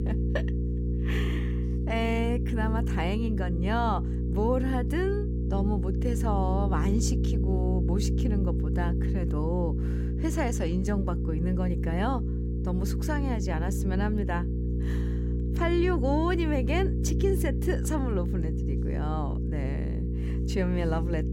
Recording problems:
electrical hum; loud; throughout; 60 Hz, 7 dB below the speech

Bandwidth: 16 kHz